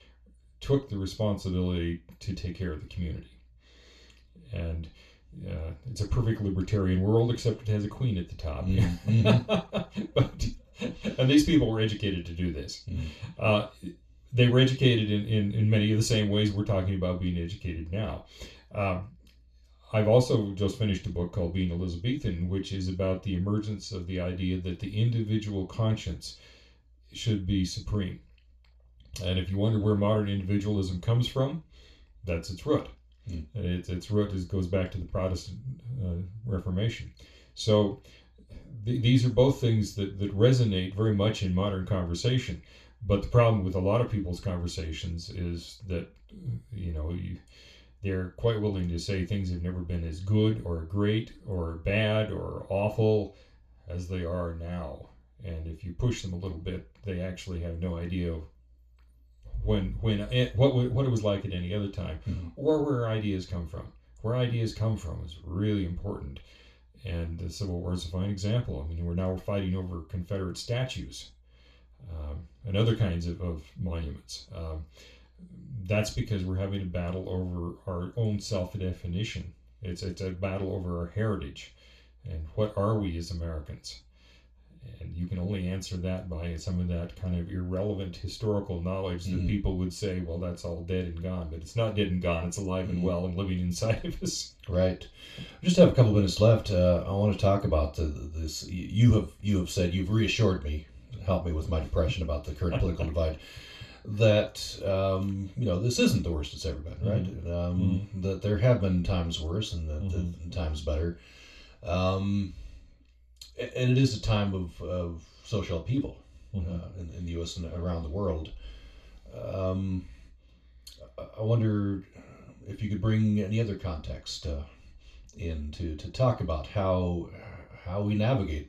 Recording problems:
off-mic speech; far
room echo; slight; dies away in 0.2 s

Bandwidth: 14 kHz